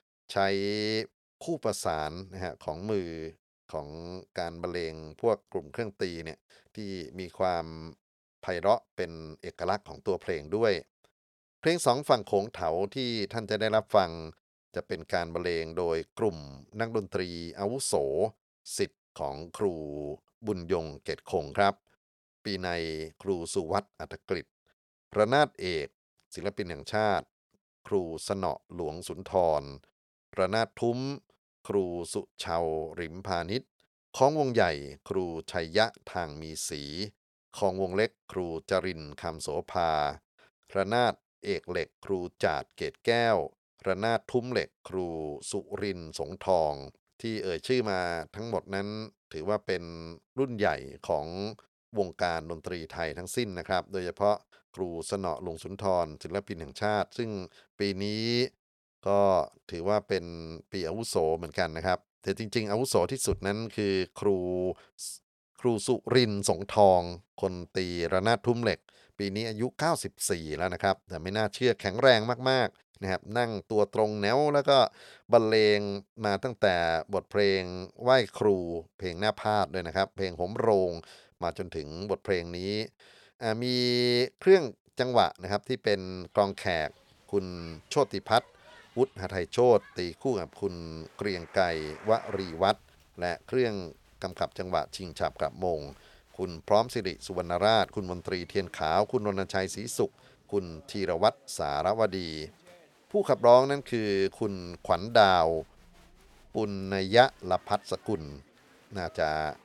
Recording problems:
crowd noise; faint; from 1:27 on; 25 dB below the speech

